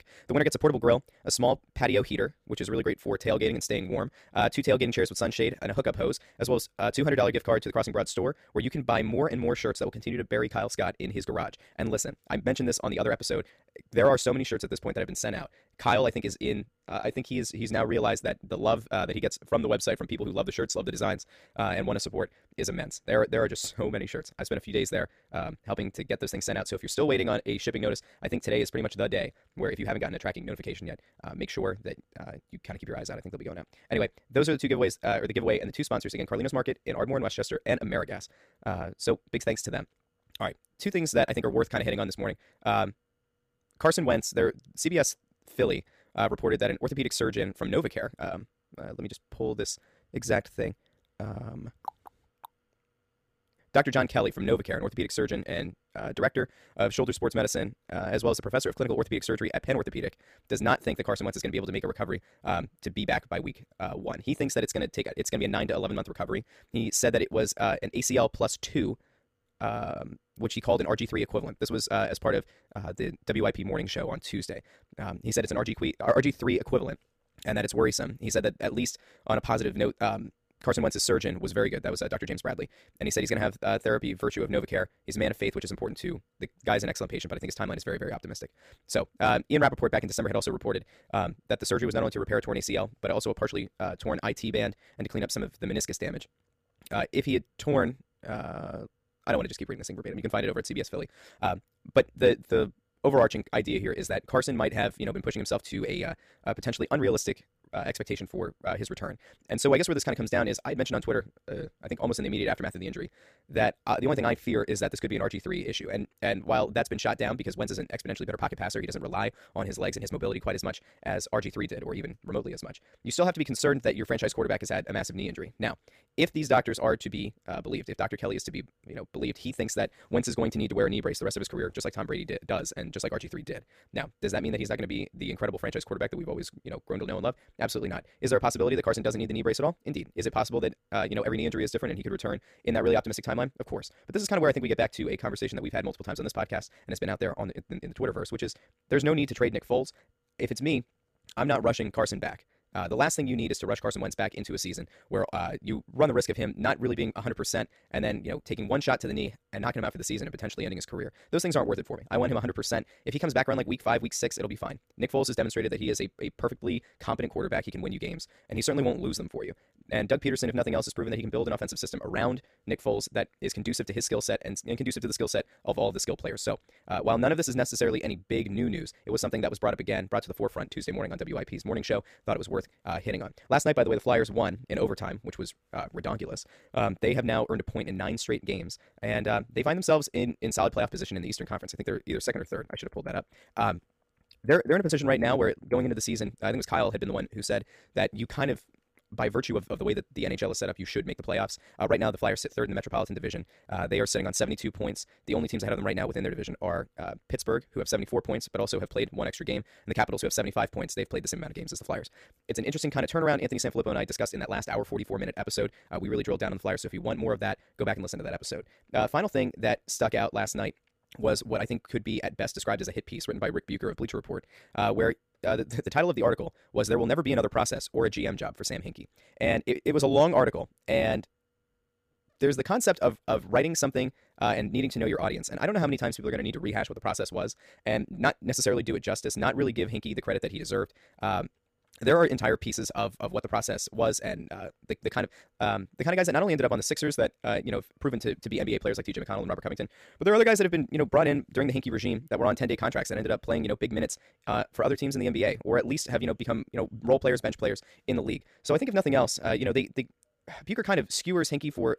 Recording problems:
wrong speed, natural pitch; too fast; 1.6 times normal speed

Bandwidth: 15 kHz